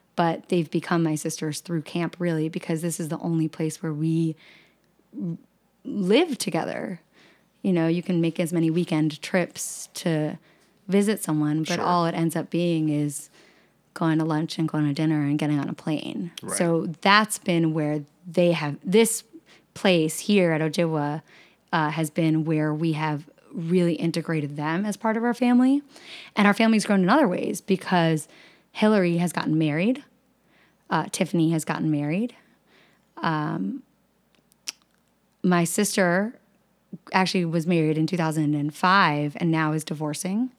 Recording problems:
none

